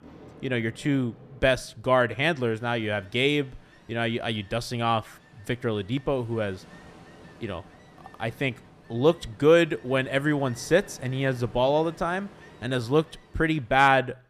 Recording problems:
rain or running water; faint; throughout; 25 dB below the speech

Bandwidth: 14.5 kHz